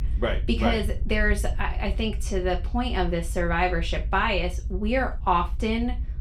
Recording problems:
off-mic speech; far
room echo; very slight; dies away in 0.3 s
low rumble; faint; throughout; 25 dB below the speech

